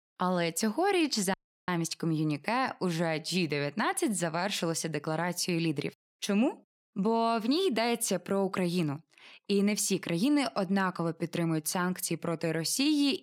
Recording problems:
audio cutting out; at 1.5 s

